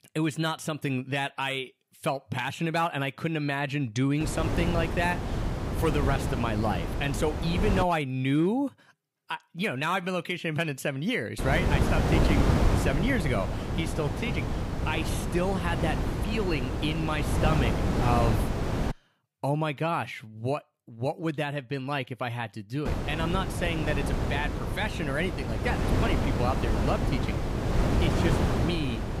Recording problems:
wind noise on the microphone; heavy; from 4 to 8 s, from 11 to 19 s and from 23 s on; 3 dB below the speech

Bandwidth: 15.5 kHz